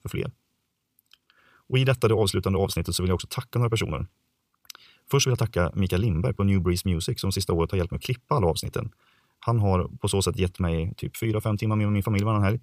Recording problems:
wrong speed, natural pitch; too fast; 1.5 times normal speed

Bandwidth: 15 kHz